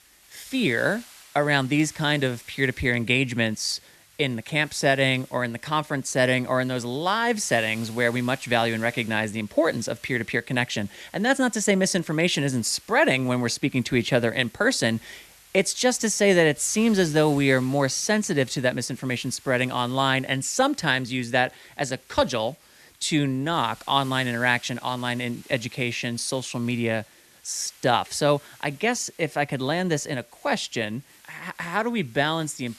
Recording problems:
hiss; faint; throughout; 25 dB below the speech

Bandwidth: 13.5 kHz